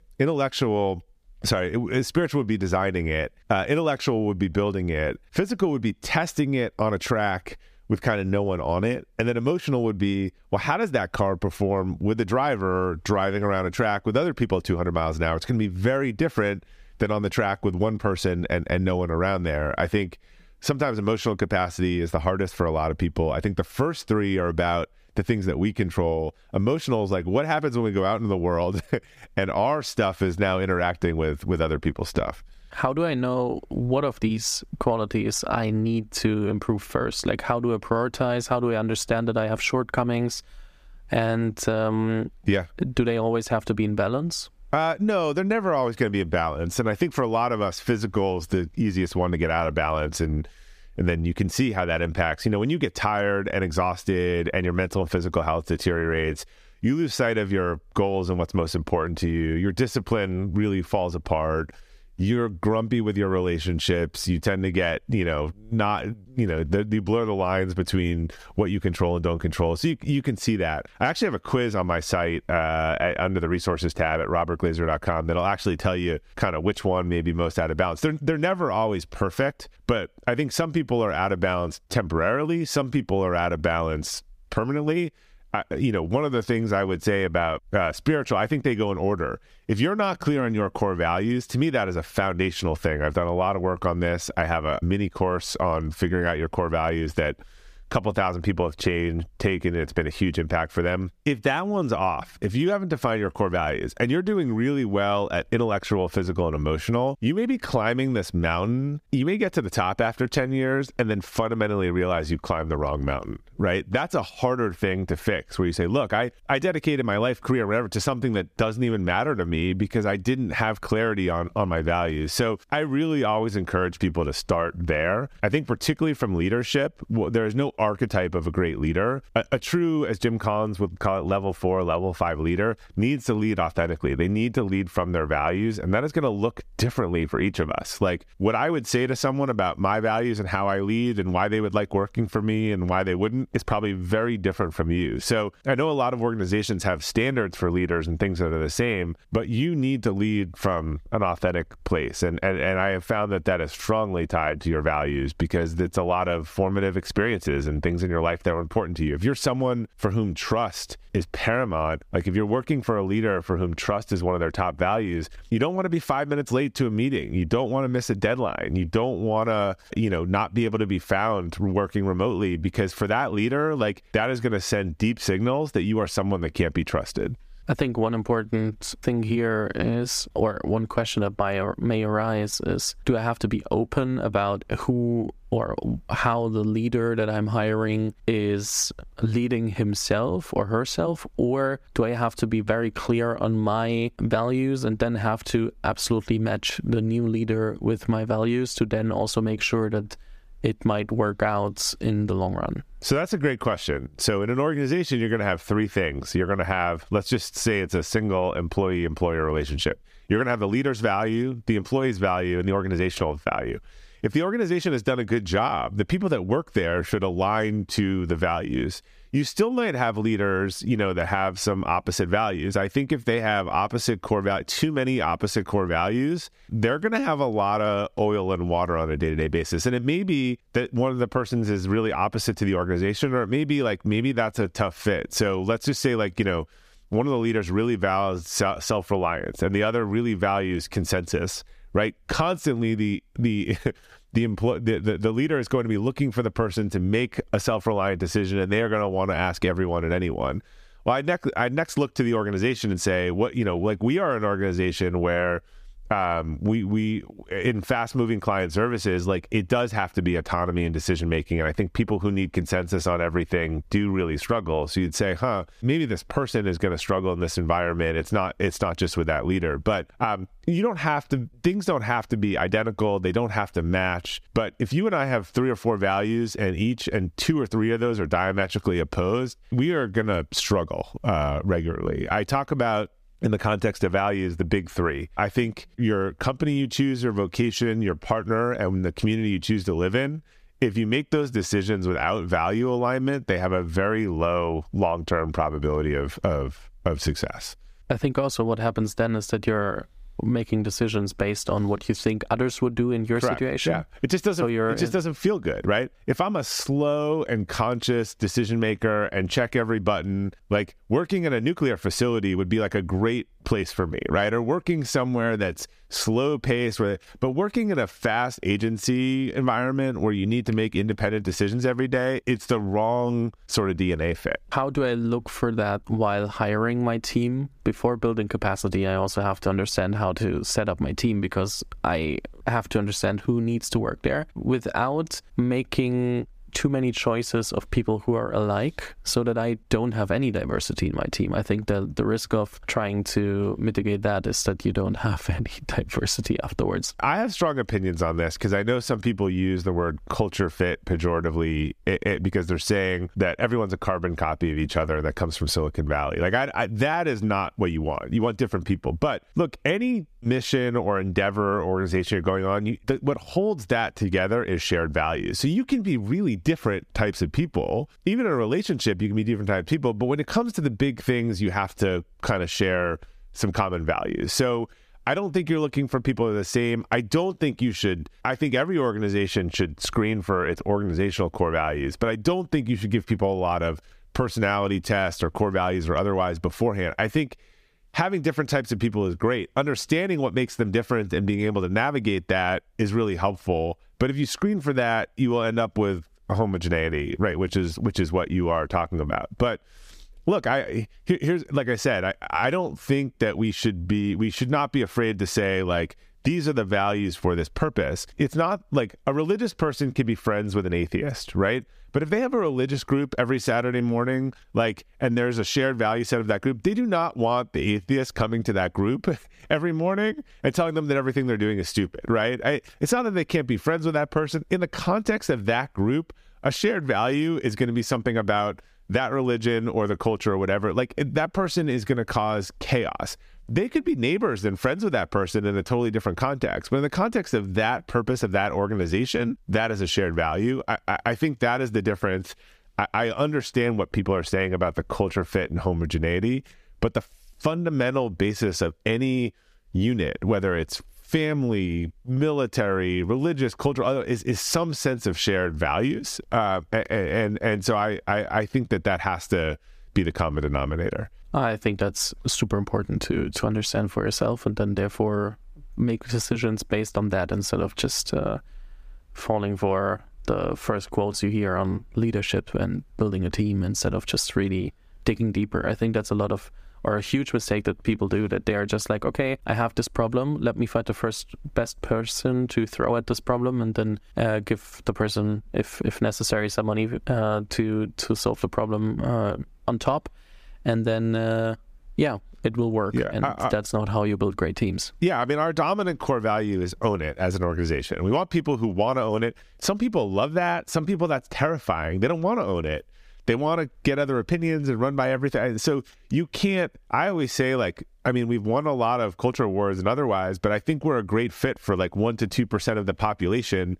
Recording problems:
squashed, flat; somewhat

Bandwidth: 15 kHz